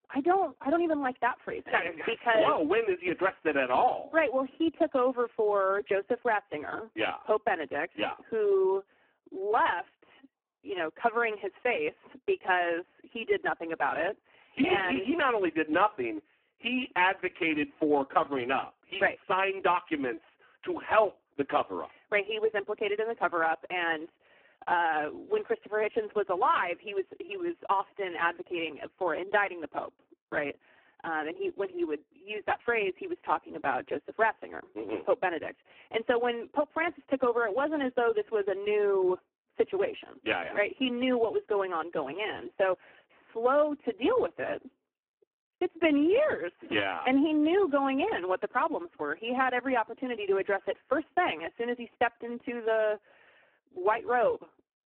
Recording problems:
phone-call audio; poor line

